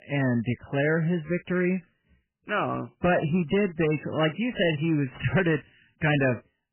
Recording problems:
garbled, watery; badly; nothing above 3 kHz
distortion; slight; 6% of the sound clipped

